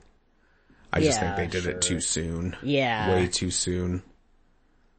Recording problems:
garbled, watery; slightly; nothing above 8 kHz

